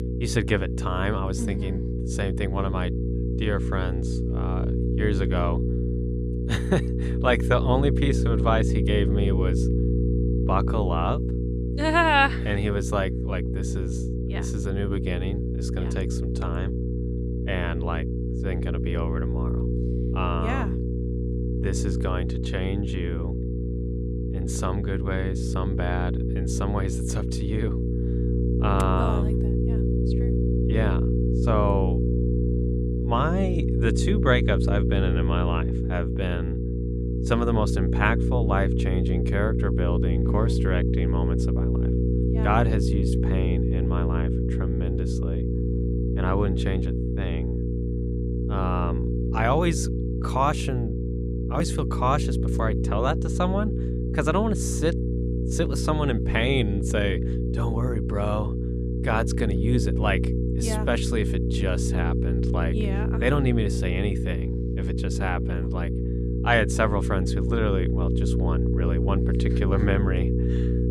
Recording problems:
electrical hum; loud; throughout; 60 Hz, 5 dB below the speech

